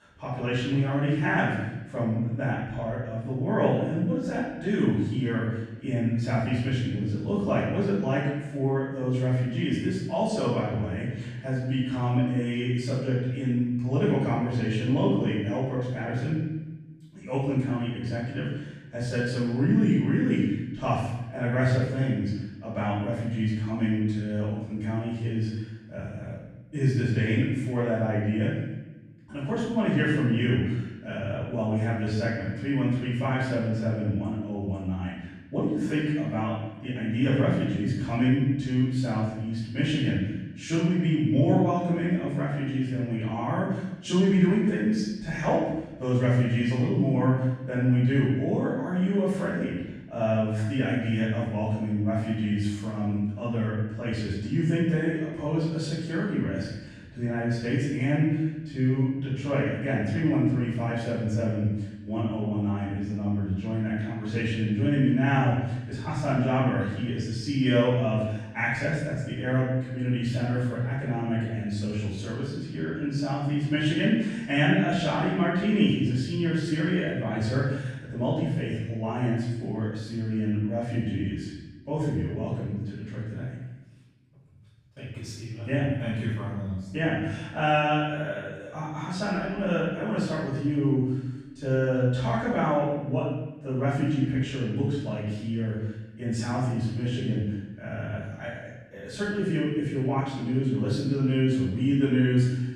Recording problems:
room echo; strong; dies away in 1 s
off-mic speech; far

